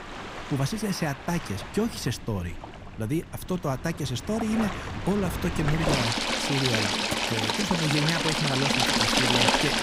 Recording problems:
rain or running water; very loud; throughout; 4 dB above the speech

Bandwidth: 15.5 kHz